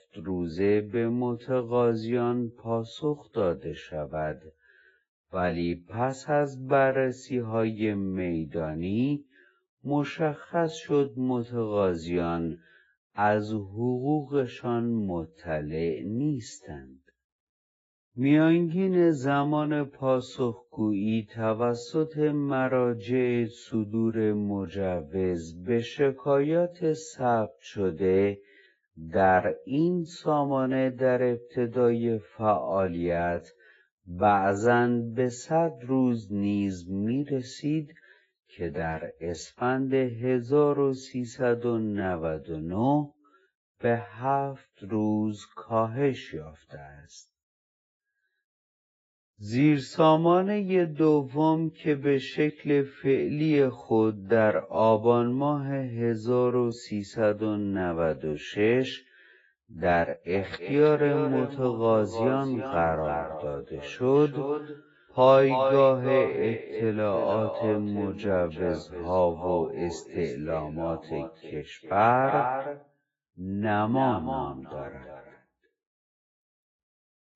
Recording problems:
echo of what is said; strong; from 1:00 on; 320 ms later, 7 dB below the speech
garbled, watery; badly; nothing above 7.5 kHz
wrong speed, natural pitch; too slow; 0.6 times normal speed

